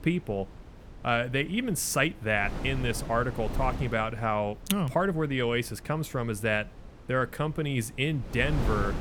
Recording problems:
wind noise on the microphone; occasional gusts; 15 dB below the speech

